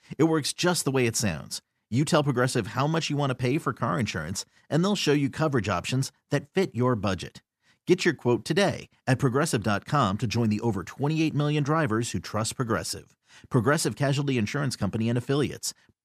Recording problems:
none

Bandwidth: 14.5 kHz